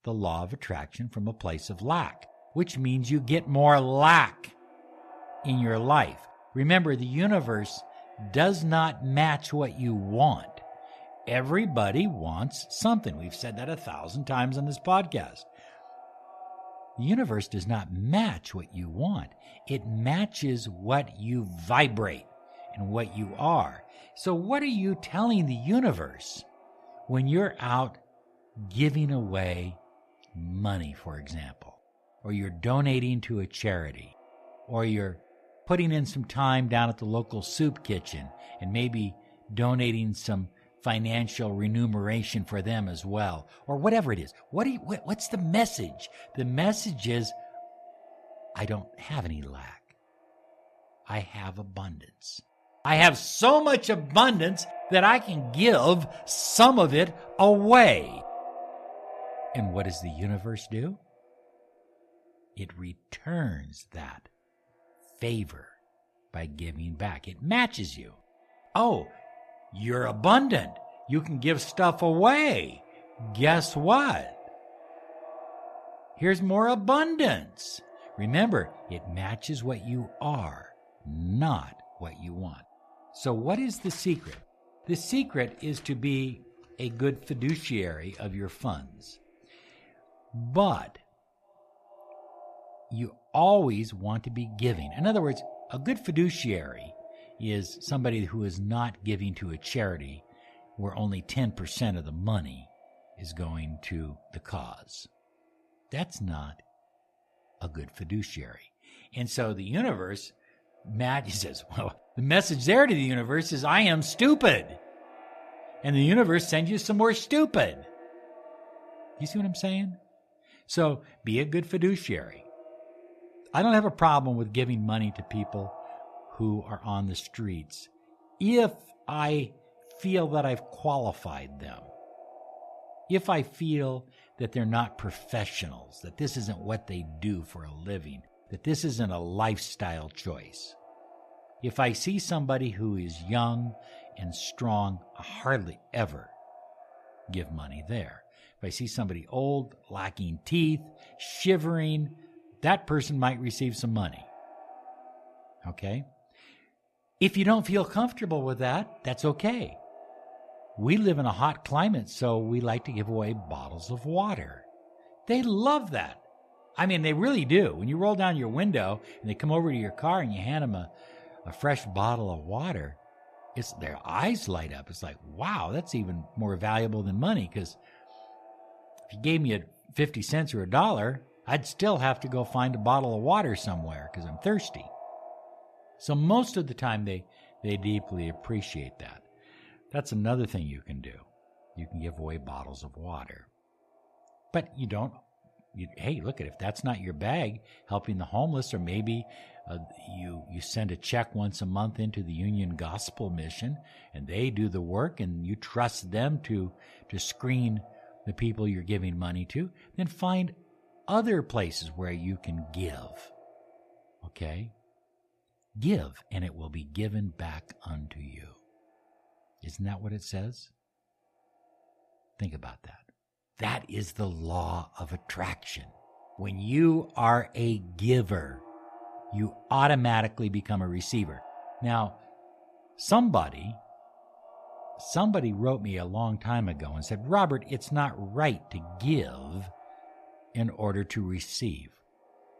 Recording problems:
echo of what is said; faint; throughout; 410 ms later, 20 dB below the speech
uneven, jittery; strongly; from 44 s to 3:36

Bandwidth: 14 kHz